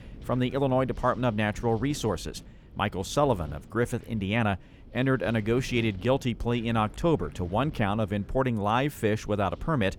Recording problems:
wind noise on the microphone; occasional gusts; 25 dB below the speech

